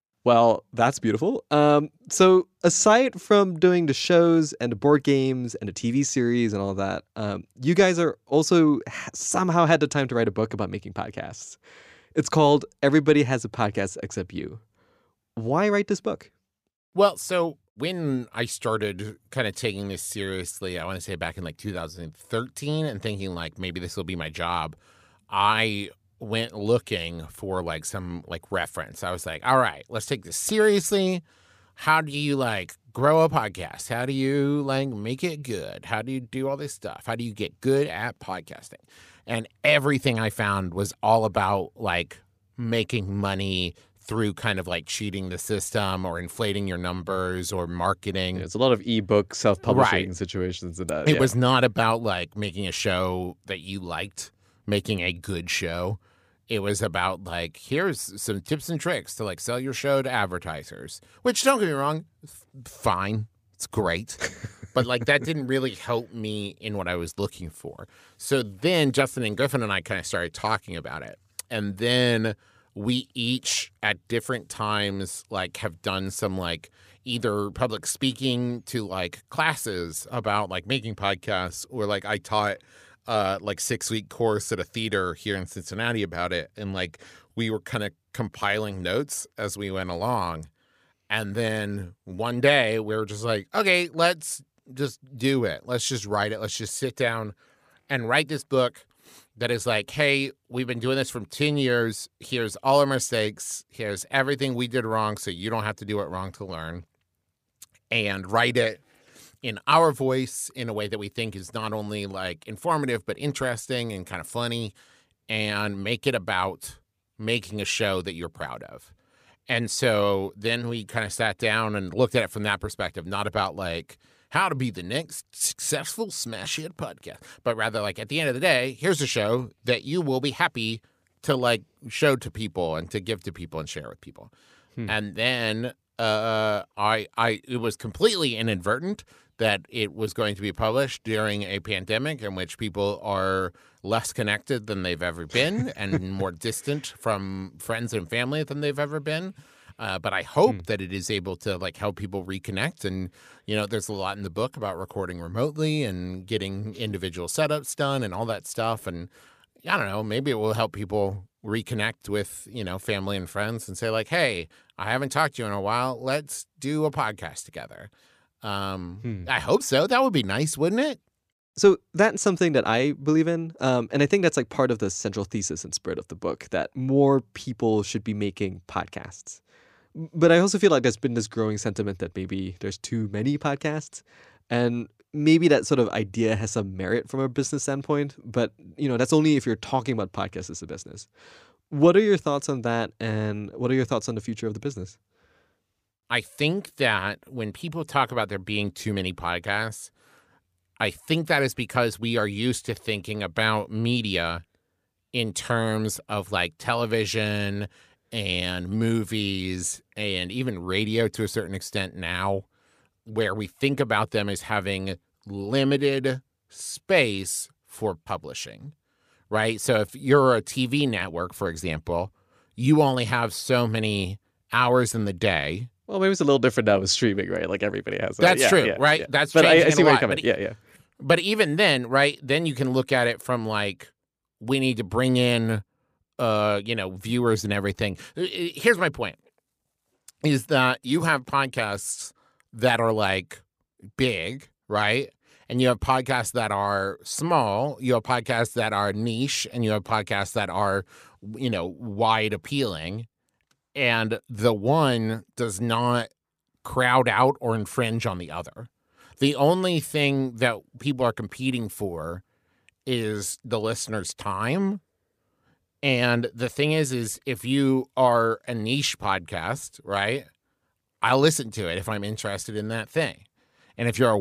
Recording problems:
abrupt cut into speech; at the end

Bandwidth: 15 kHz